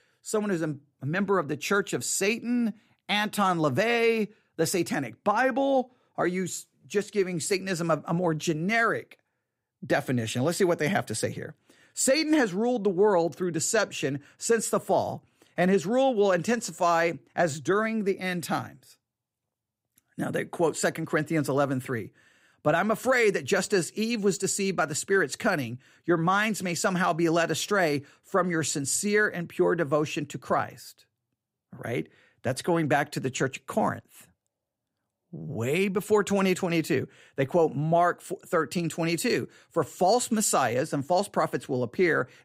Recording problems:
none

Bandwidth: 15.5 kHz